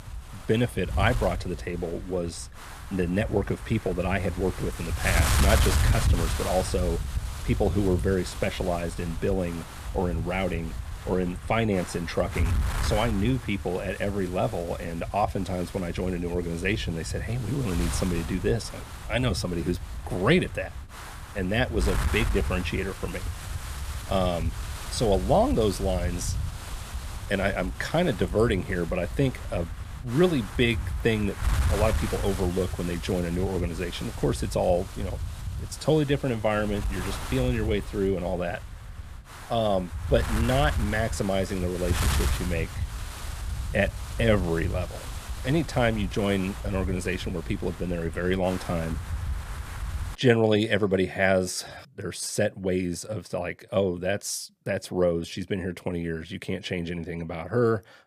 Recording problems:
wind noise on the microphone; heavy; until 50 s; 10 dB below the speech

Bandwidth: 15 kHz